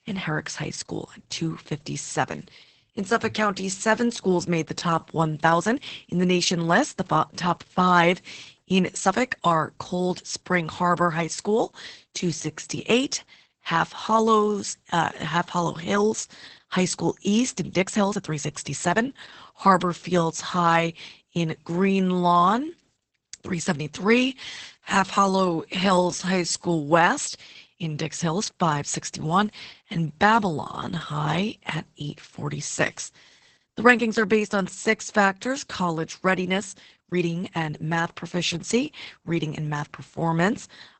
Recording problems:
garbled, watery; badly; nothing above 8 kHz
uneven, jittery; strongly; from 5 to 40 s

